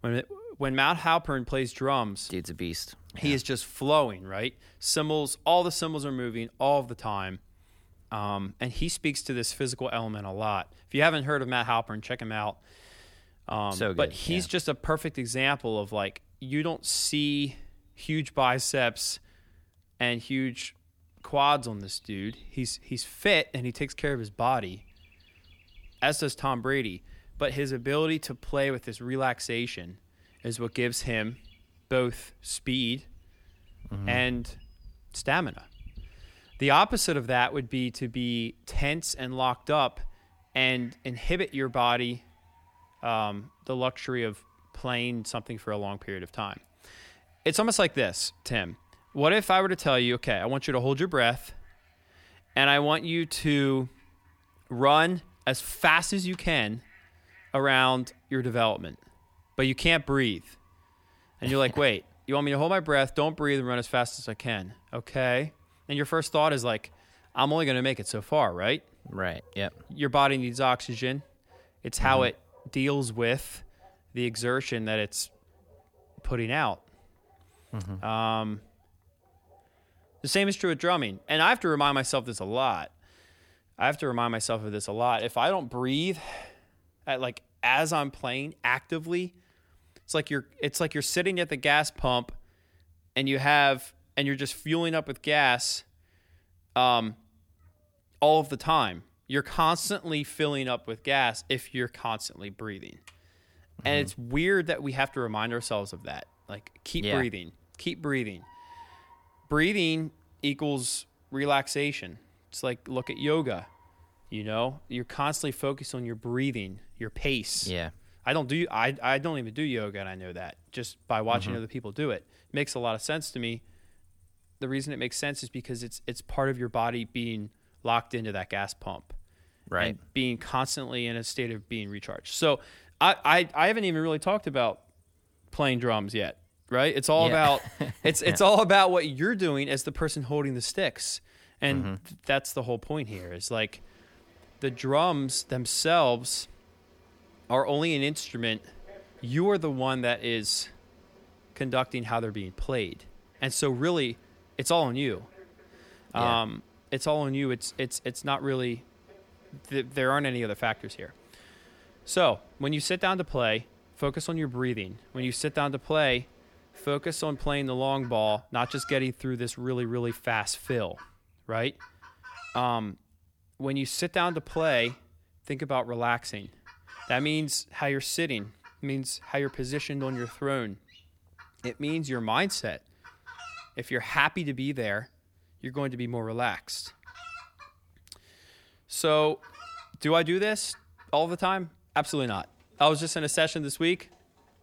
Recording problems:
animal sounds; faint; throughout; 30 dB below the speech

